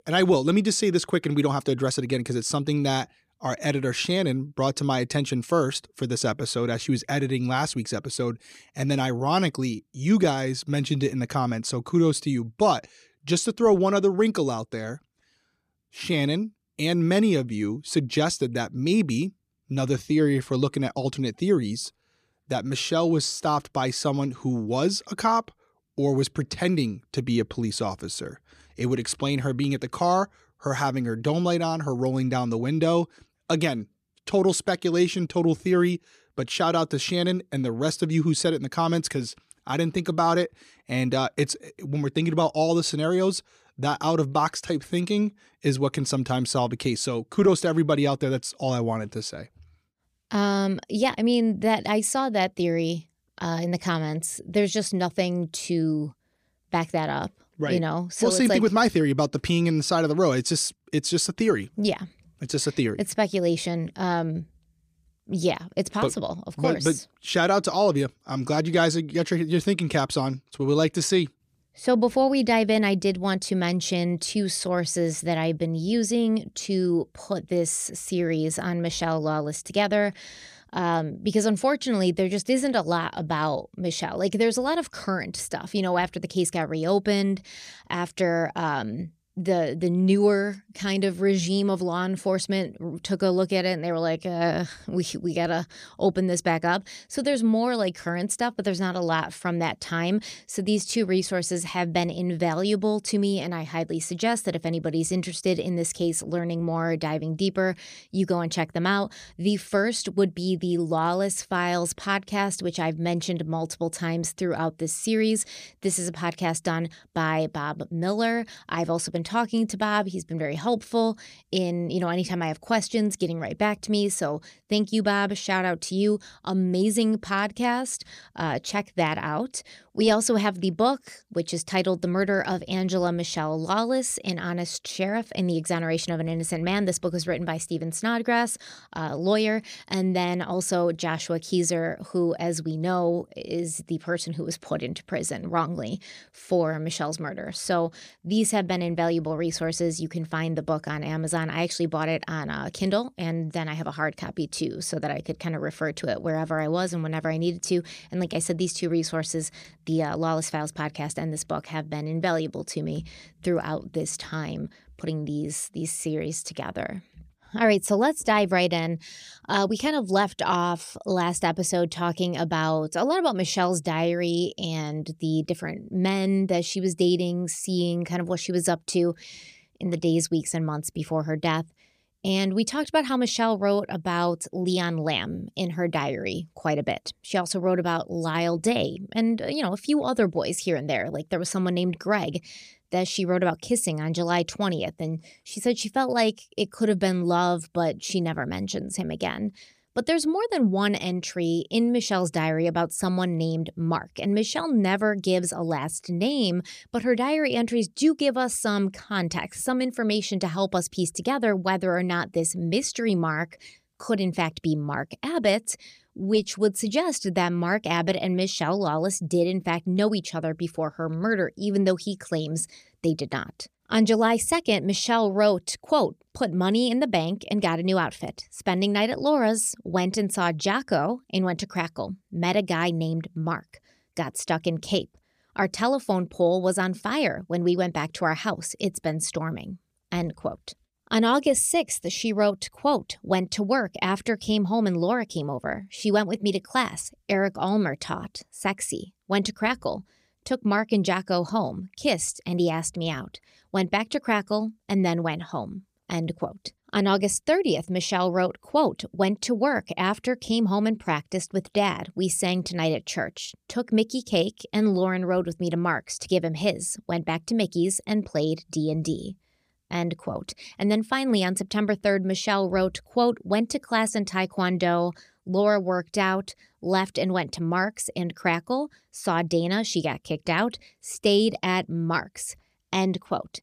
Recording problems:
none

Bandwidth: 14.5 kHz